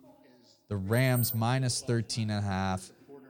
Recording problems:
background chatter; faint; throughout; 2 voices, 25 dB below the speech
jangling keys; noticeable; at 1 s; peak 4 dB below the speech

